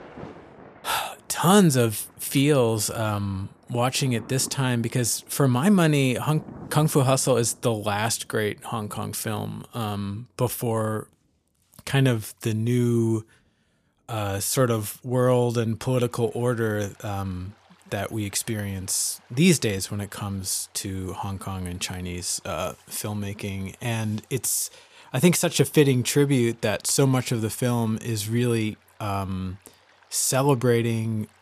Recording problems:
rain or running water; faint; throughout; 25 dB below the speech

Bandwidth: 14.5 kHz